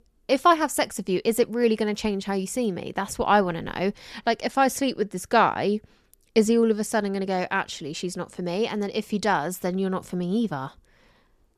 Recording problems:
none

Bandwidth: 14 kHz